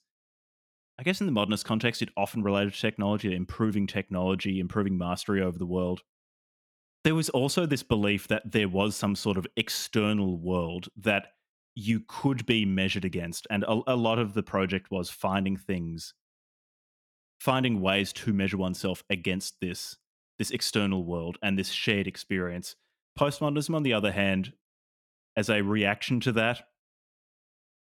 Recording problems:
none

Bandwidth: 17.5 kHz